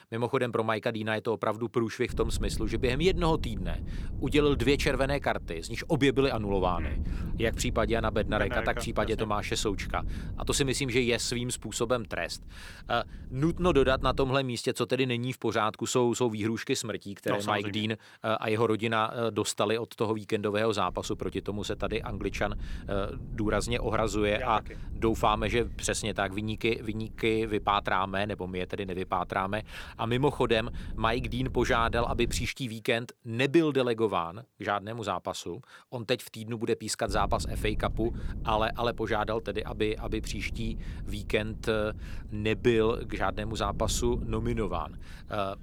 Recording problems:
wind noise on the microphone; occasional gusts; from 2 to 14 s, from 21 to 32 s and from 37 s on; 20 dB below the speech

